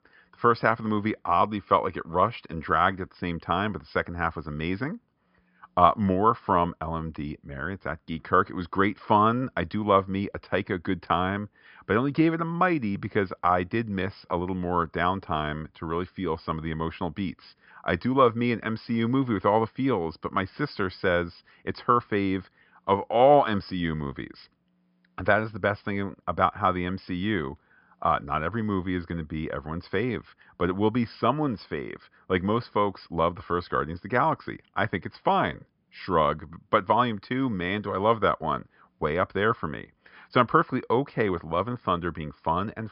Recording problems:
high frequencies cut off; noticeable; nothing above 5.5 kHz

